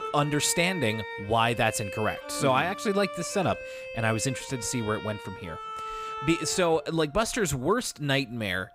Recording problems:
background music; noticeable; throughout; 10 dB below the speech

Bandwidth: 15.5 kHz